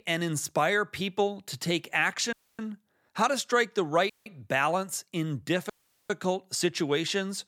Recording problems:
audio cutting out; at 2.5 s, at 4 s and at 5.5 s

